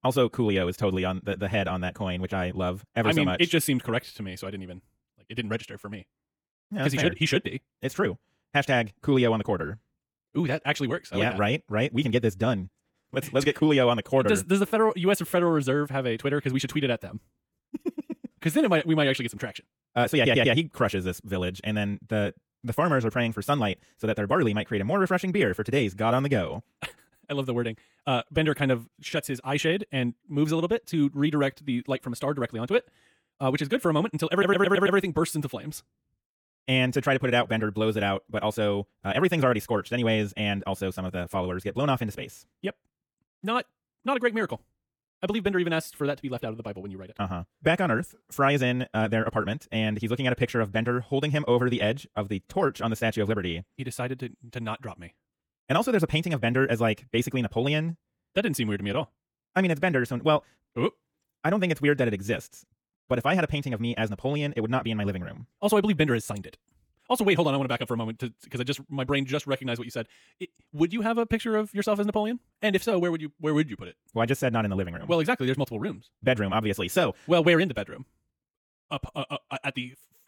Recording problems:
wrong speed, natural pitch; too fast; 1.7 times normal speed
audio stuttering; at 20 s and at 34 s

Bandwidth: 18.5 kHz